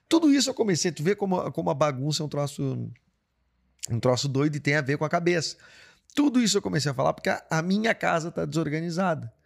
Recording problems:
none

